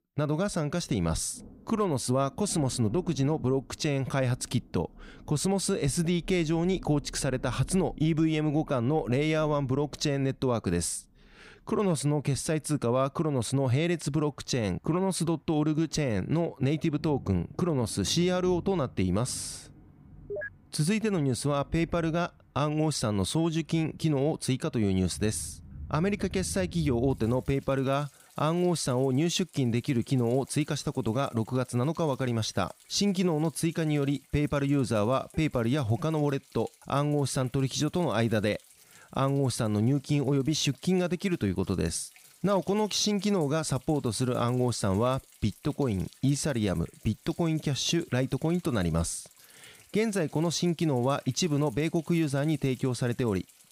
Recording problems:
rain or running water; faint; throughout; 20 dB below the speech

